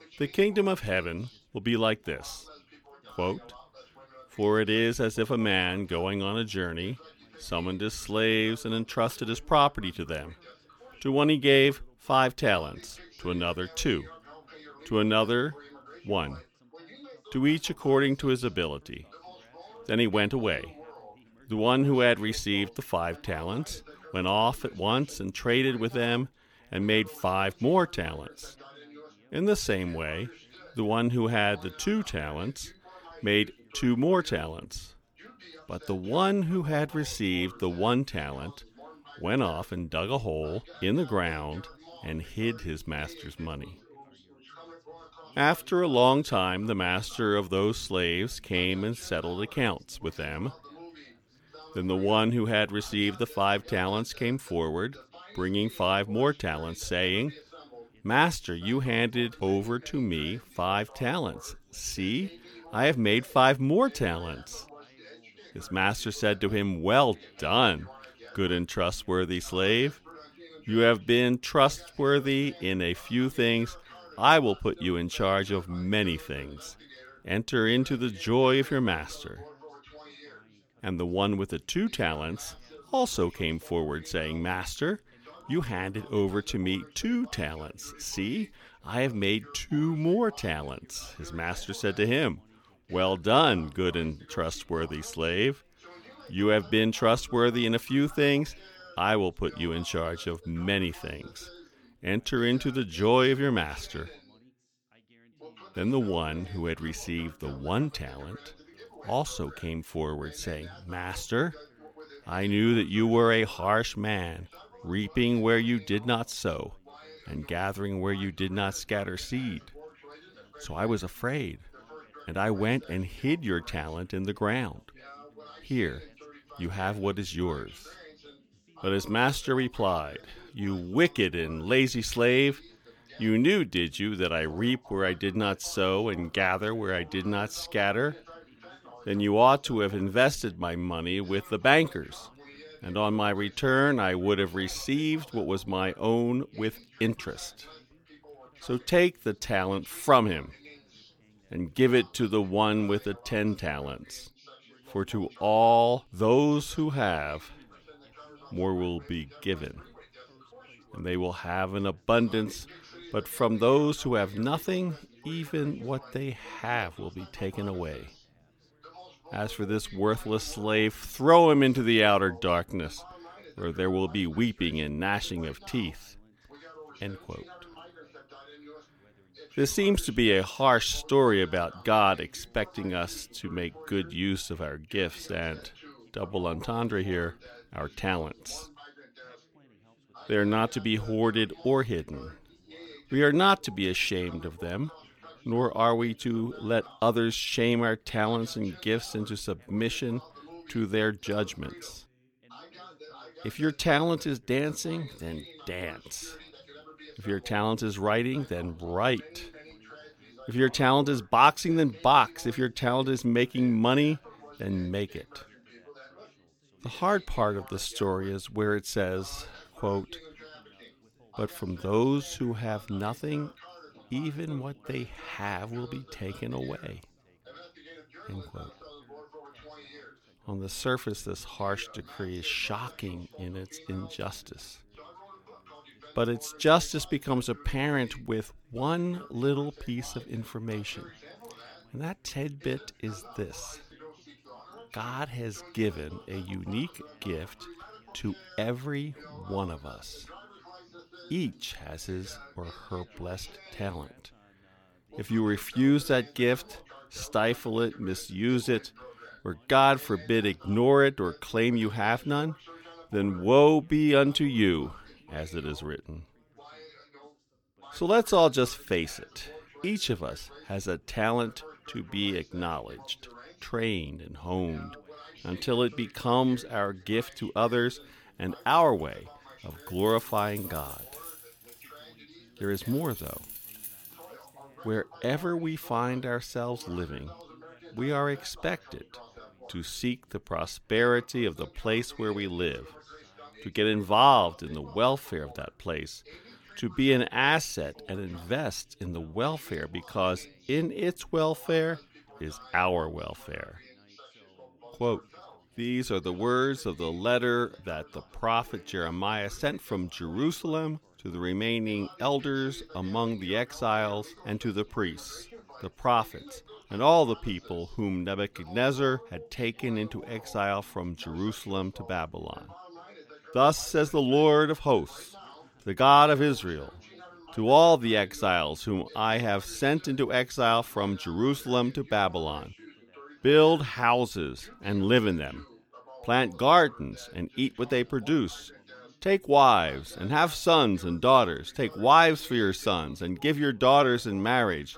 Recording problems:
background chatter; faint; throughout; 3 voices, 25 dB below the speech
jangling keys; faint; from 4:39 to 4:44; peak 10 dB below the speech

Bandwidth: 18.5 kHz